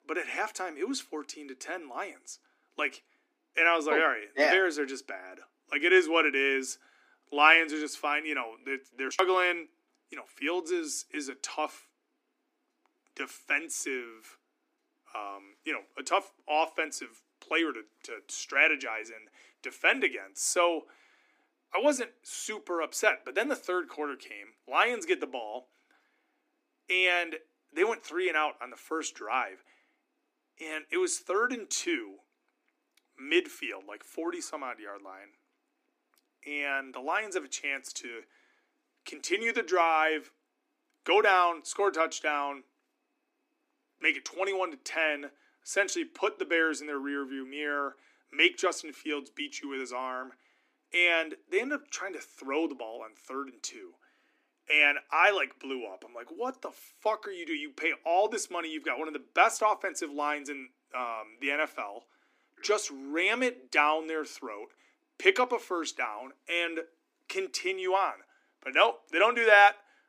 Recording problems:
thin; somewhat; fading below 250 Hz

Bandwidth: 15 kHz